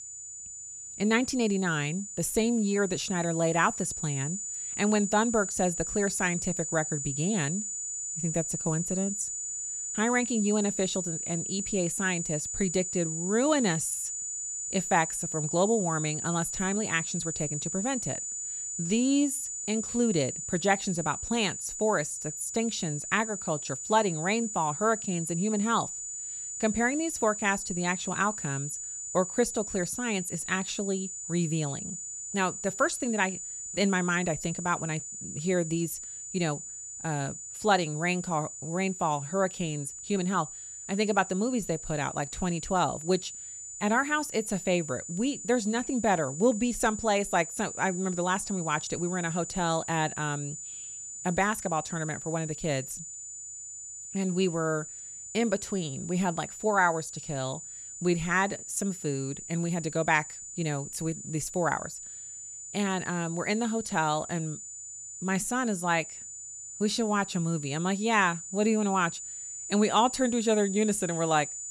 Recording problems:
high-pitched whine; loud; throughout; 7 kHz, 6 dB below the speech

